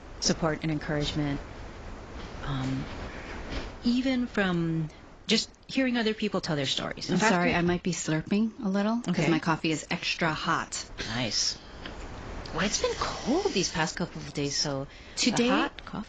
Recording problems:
garbled, watery; badly; nothing above 7.5 kHz
wind noise on the microphone; occasional gusts; 15 dB below the speech

